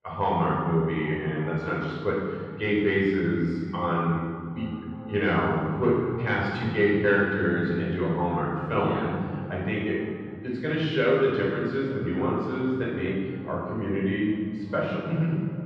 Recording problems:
room echo; strong; dies away in 2.4 s
off-mic speech; far
echo of what is said; noticeable; throughout; 370 ms later, 15 dB below the speech
muffled; slightly; fading above 3 kHz

